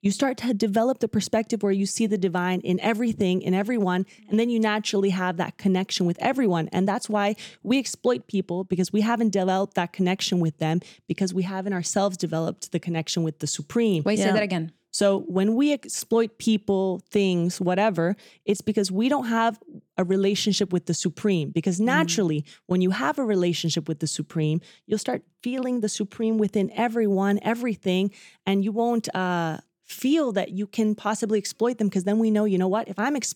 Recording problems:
none

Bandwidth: 17 kHz